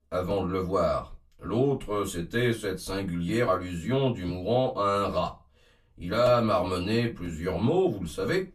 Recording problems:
off-mic speech; far
room echo; very slight; dies away in 0.2 s

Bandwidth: 14 kHz